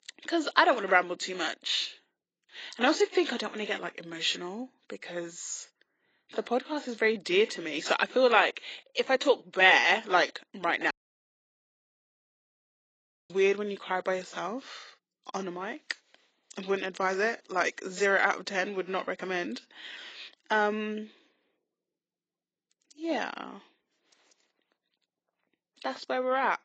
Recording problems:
garbled, watery; badly; nothing above 7.5 kHz
thin; somewhat; fading below 300 Hz
audio cutting out; at 11 s for 2.5 s

